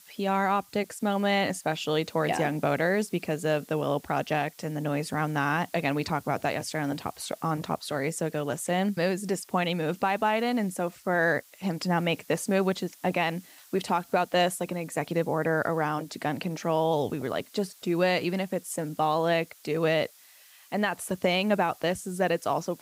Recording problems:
hiss; faint; throughout; 25 dB below the speech

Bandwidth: 15.5 kHz